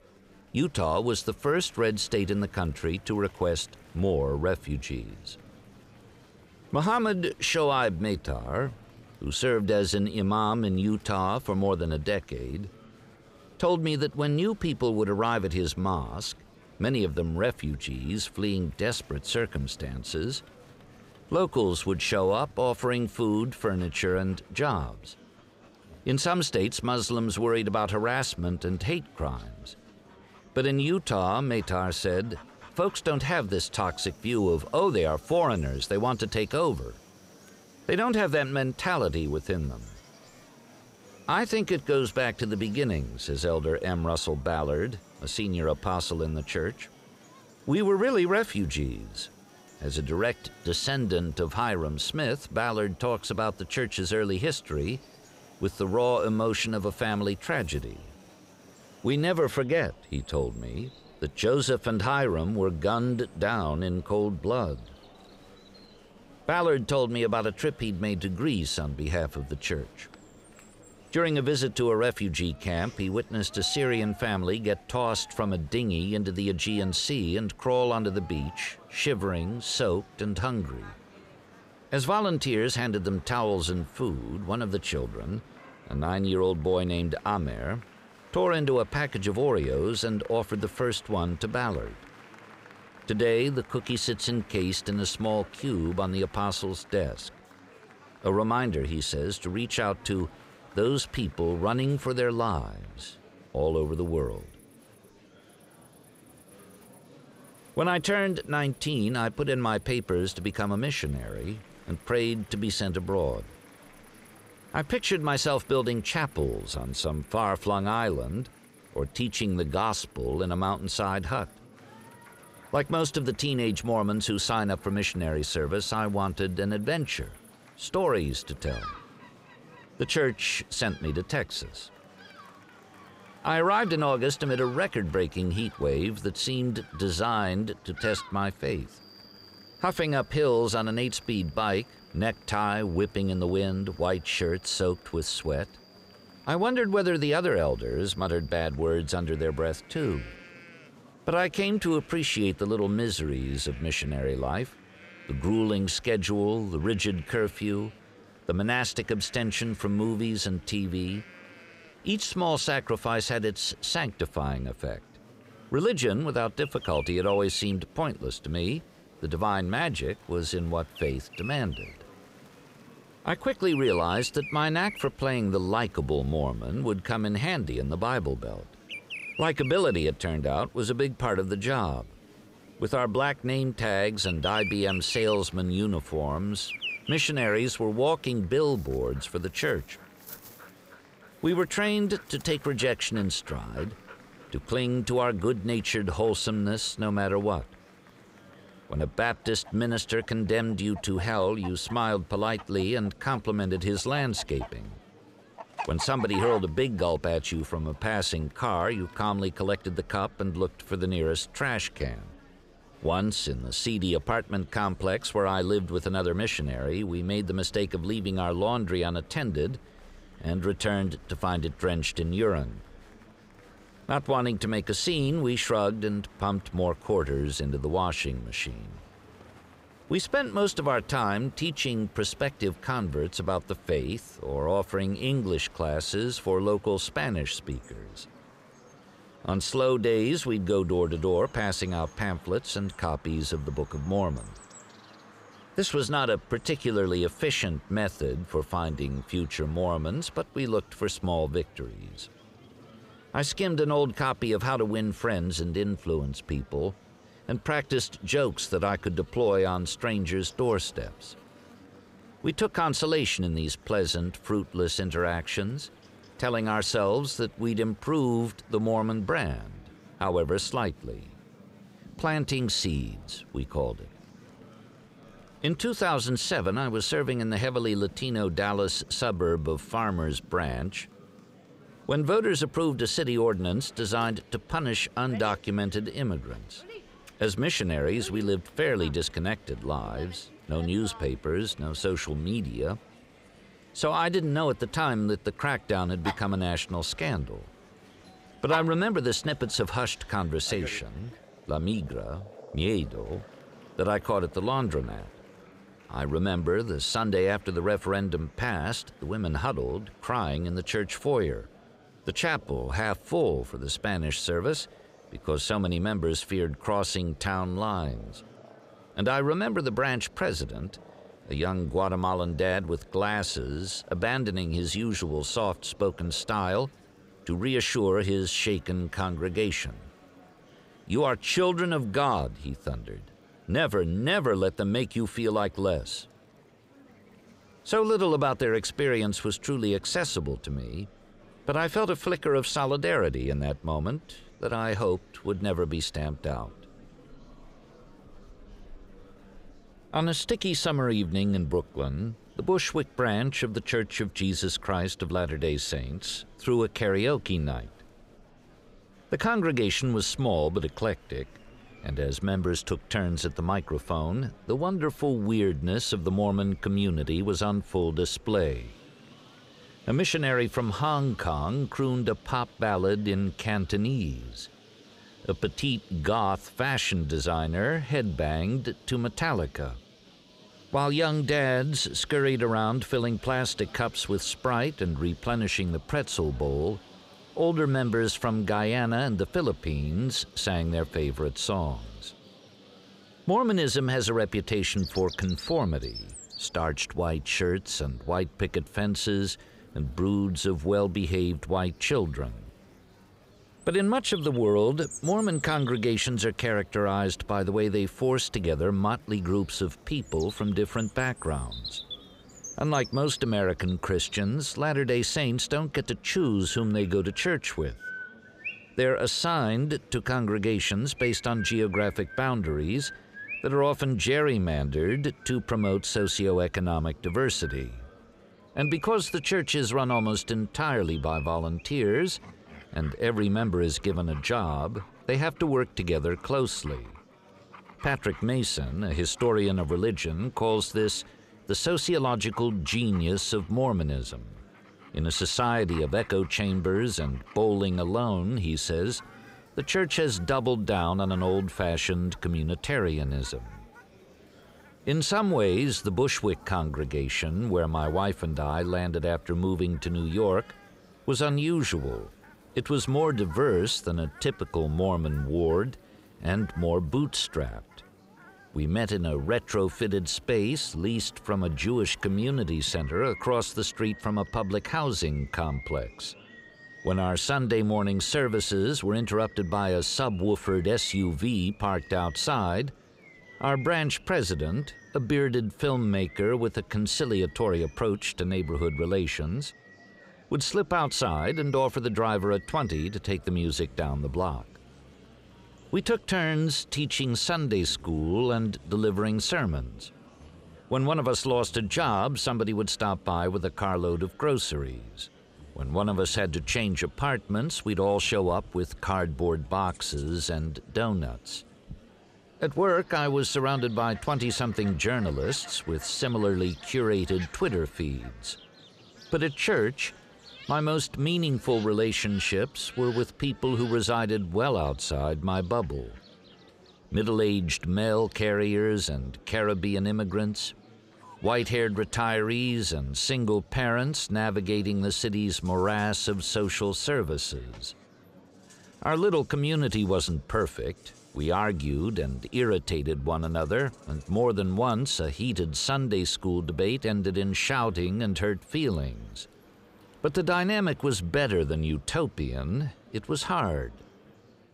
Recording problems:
animal sounds; noticeable; throughout; 20 dB below the speech
murmuring crowd; faint; throughout; 25 dB below the speech

